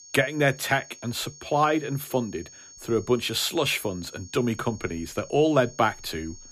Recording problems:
high-pitched whine; noticeable; throughout; 6.5 kHz, 20 dB below the speech

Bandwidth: 15 kHz